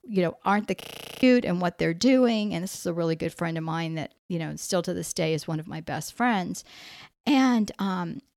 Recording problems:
audio freezing; at 1 s

